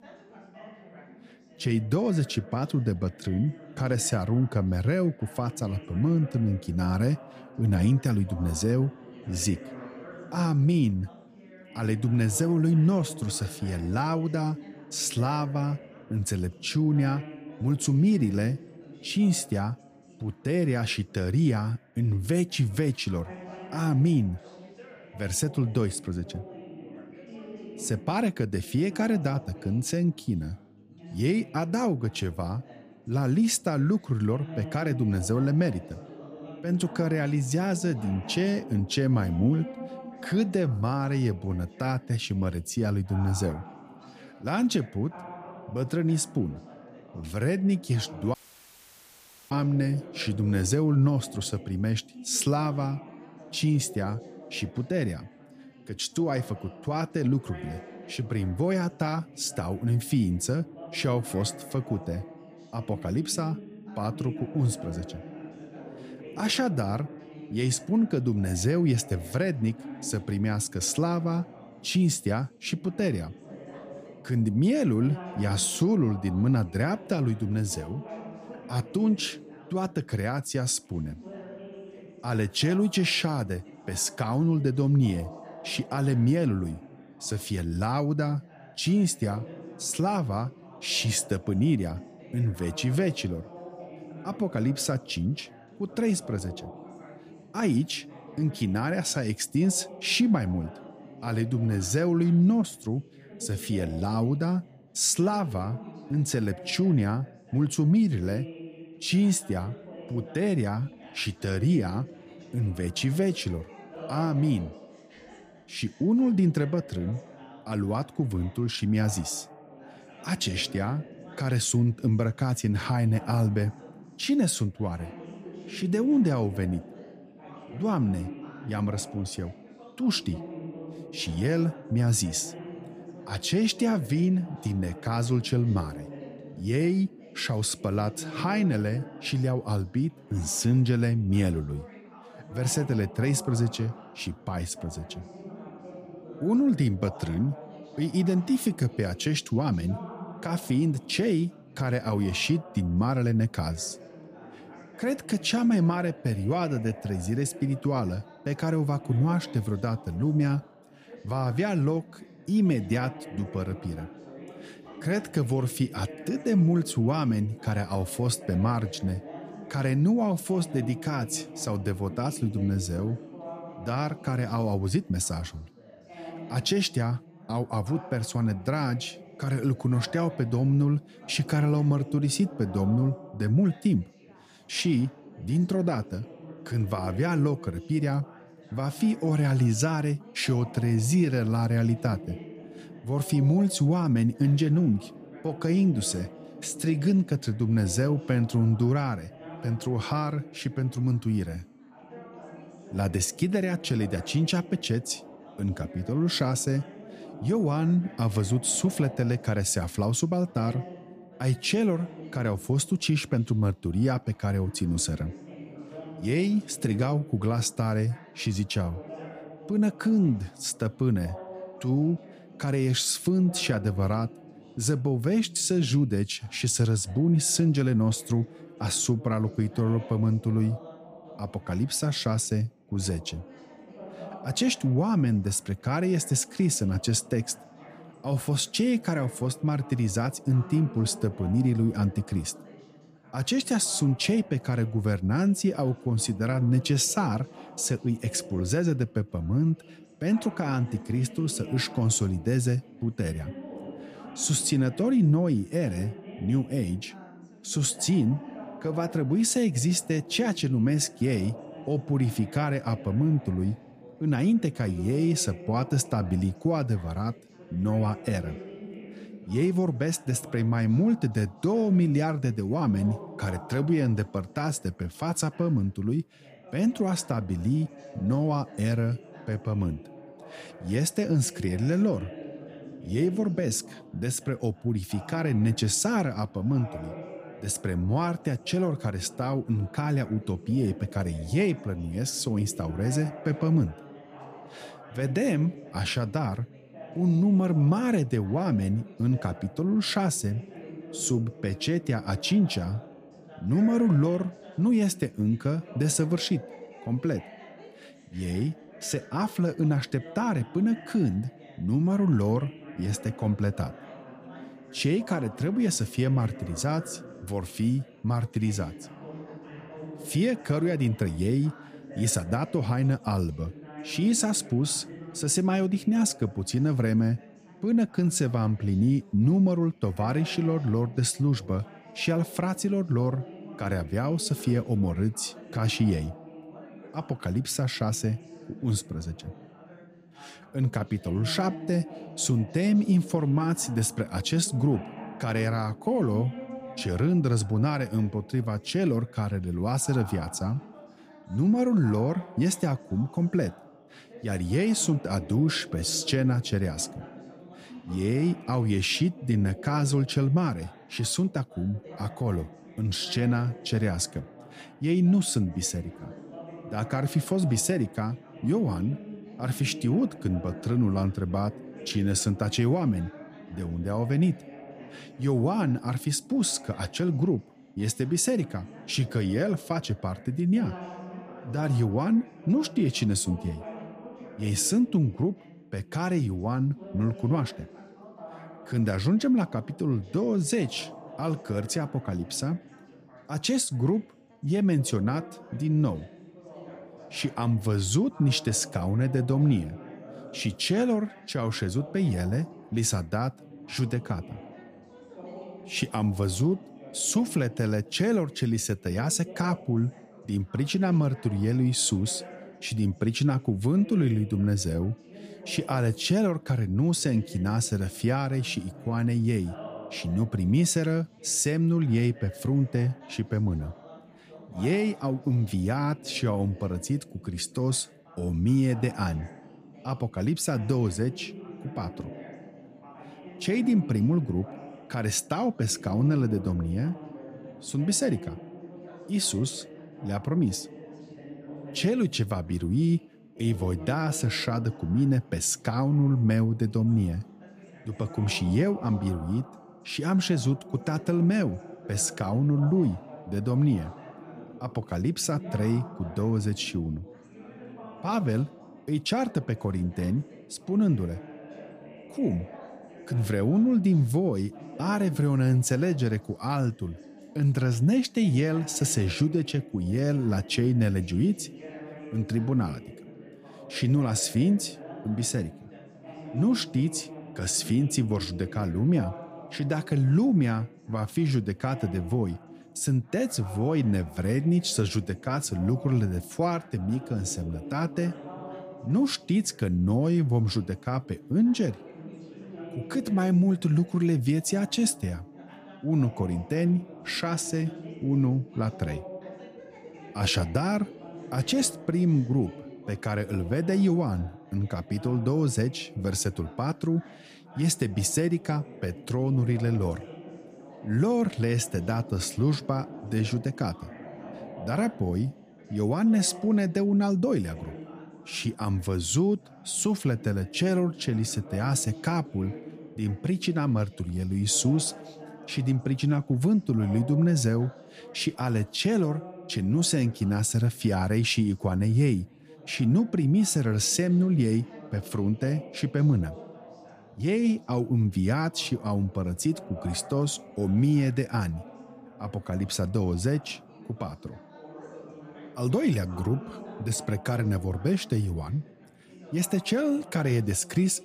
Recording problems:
background chatter; noticeable; throughout; 3 voices, 15 dB below the speech
audio cutting out; at 48 s for 1 s

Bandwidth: 15 kHz